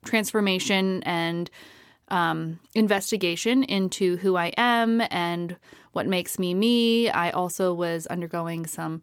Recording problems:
none

